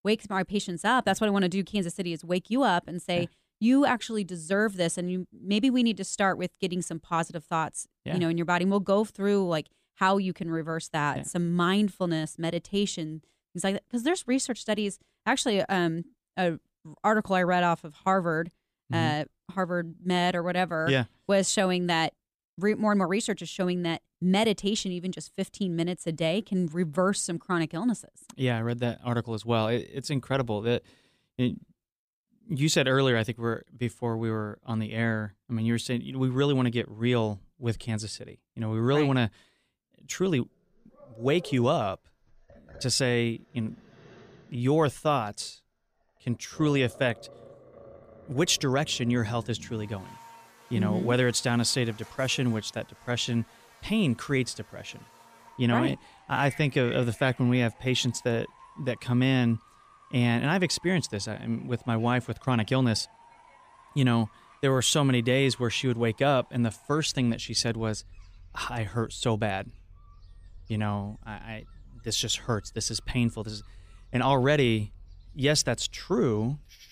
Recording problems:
animal sounds; faint; from 41 s on; 25 dB below the speech

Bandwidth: 15 kHz